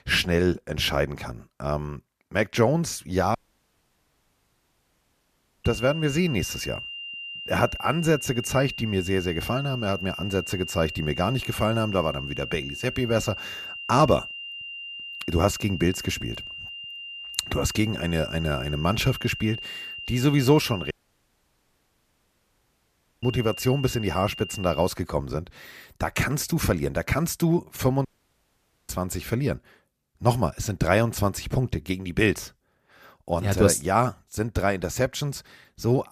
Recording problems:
high-pitched whine; loud; from 5.5 to 25 s; 3 kHz, 9 dB below the speech
audio cutting out; at 3.5 s for 2.5 s, at 21 s for 2.5 s and at 28 s for 1 s

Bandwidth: 14.5 kHz